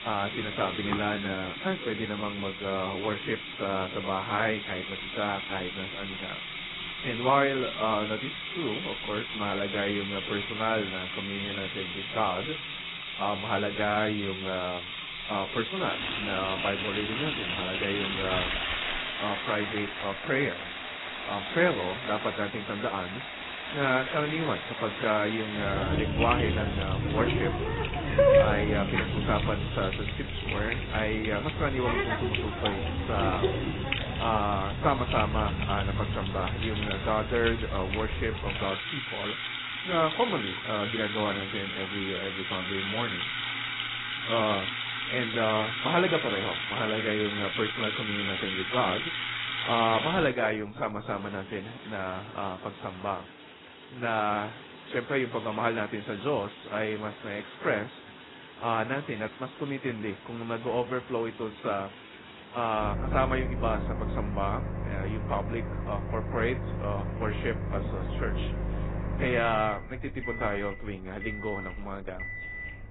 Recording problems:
garbled, watery; badly; nothing above 4 kHz
household noises; loud; throughout; as loud as the speech

